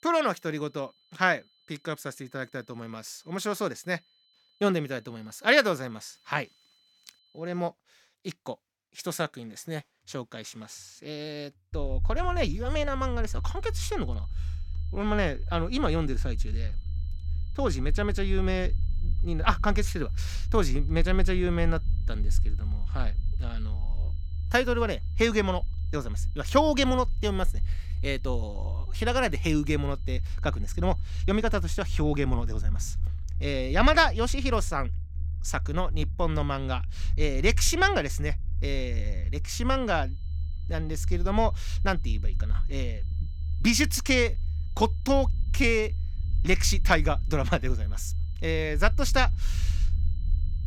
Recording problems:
high-pitched whine; faint; until 7.5 s, from 13 to 32 s and from 40 s on; 4 kHz, 35 dB below the speech
low rumble; faint; from 12 s on; 25 dB below the speech

